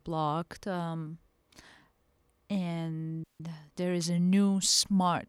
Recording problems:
audio cutting out; at 3 s

